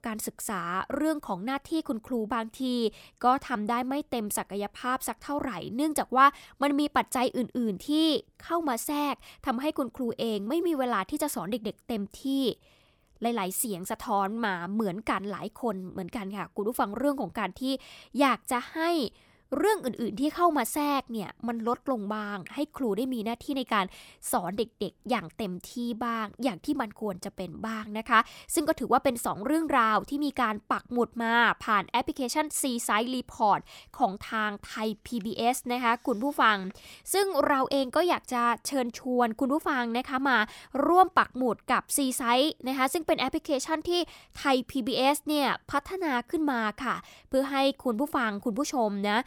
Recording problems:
none

